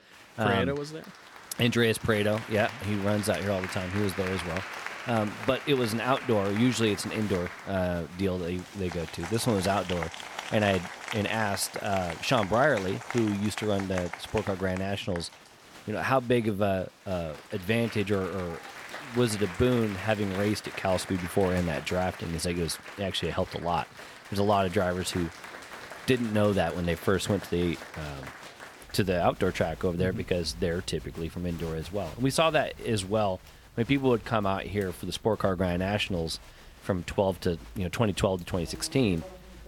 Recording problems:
crowd noise; noticeable; throughout; 15 dB below the speech

